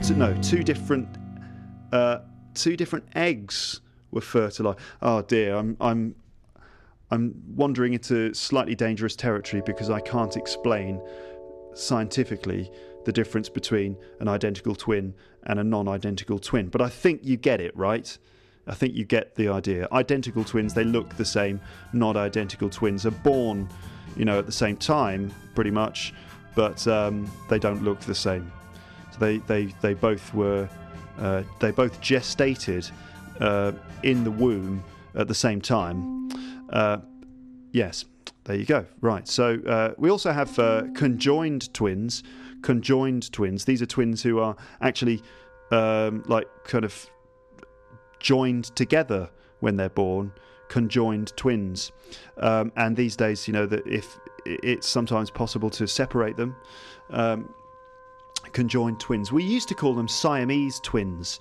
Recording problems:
background music; noticeable; throughout; 15 dB below the speech

